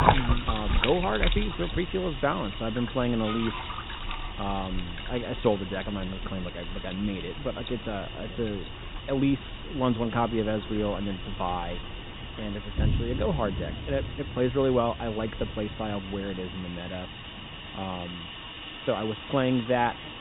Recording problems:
high frequencies cut off; severe; nothing above 4 kHz
rain or running water; loud; throughout; 6 dB below the speech
animal sounds; noticeable; until 5.5 s; 10 dB below the speech
wind noise on the microphone; occasional gusts; 25 dB below the speech
hiss; noticeable; throughout; 10 dB below the speech

